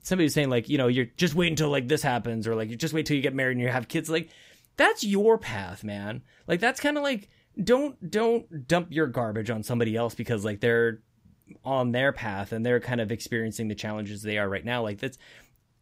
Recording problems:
none

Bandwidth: 15.5 kHz